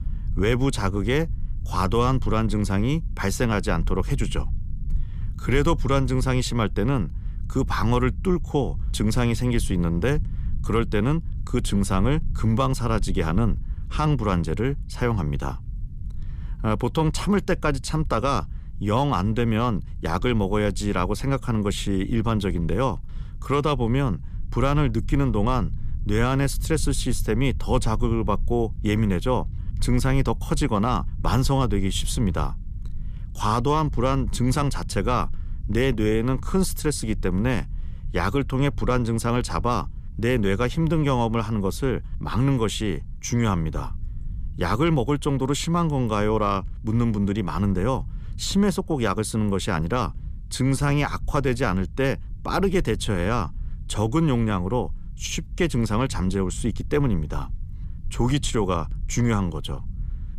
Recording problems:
low rumble; faint; throughout; 25 dB below the speech

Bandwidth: 14.5 kHz